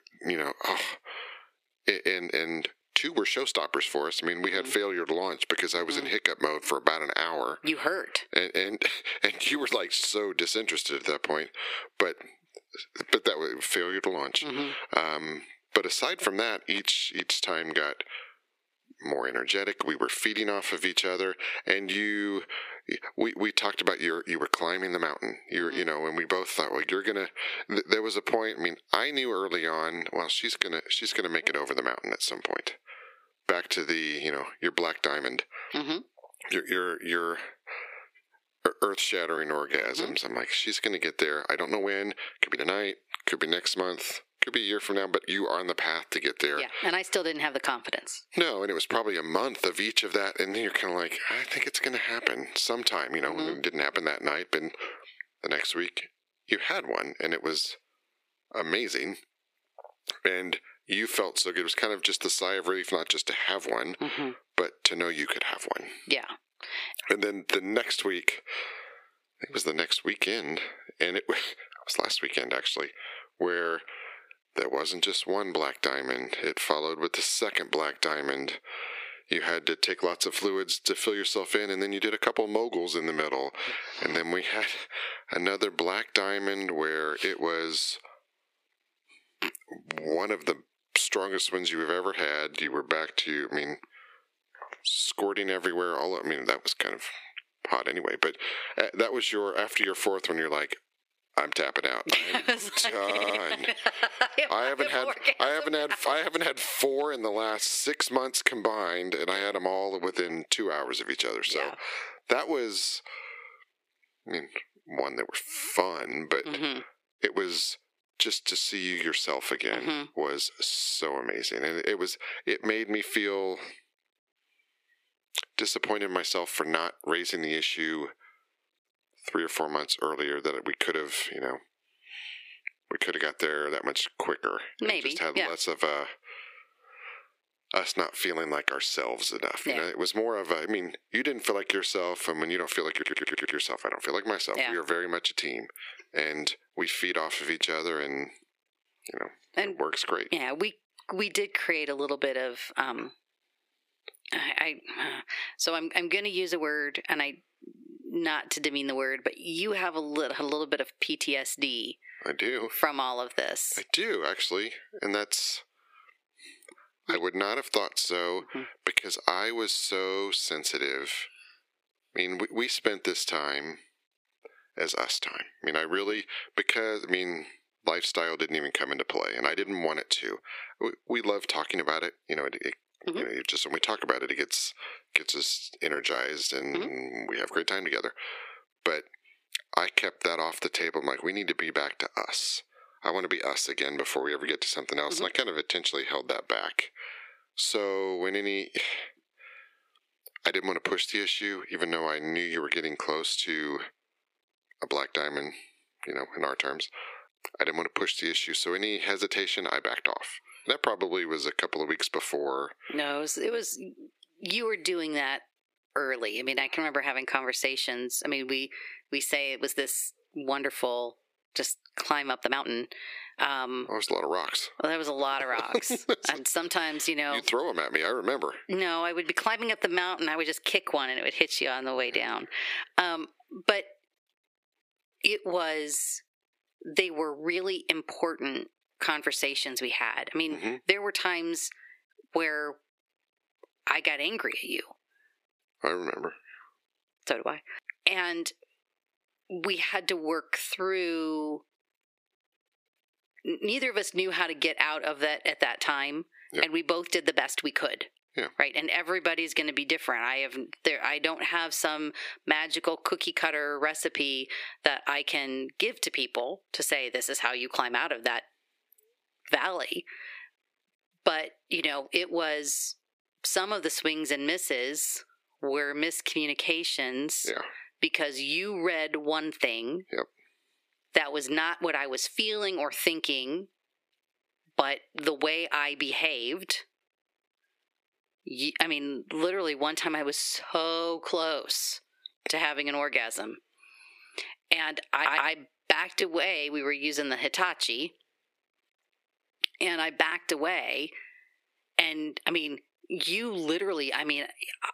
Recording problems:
squashed, flat; heavily
thin; somewhat; fading below 350 Hz
uneven, jittery; strongly; from 13 s to 4:57
audio stuttering; at 1:43, at 2:23 and at 4:55

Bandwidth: 15 kHz